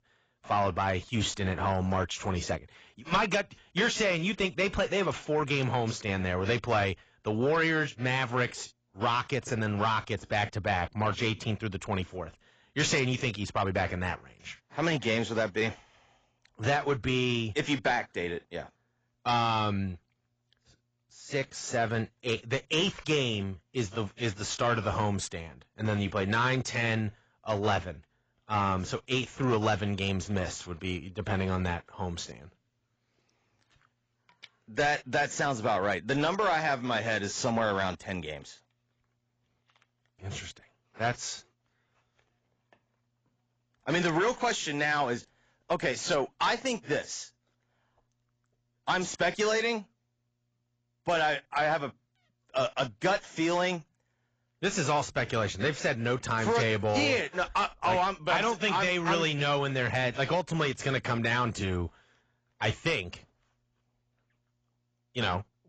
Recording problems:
garbled, watery; badly; nothing above 7.5 kHz
distortion; slight; 10 dB below the speech

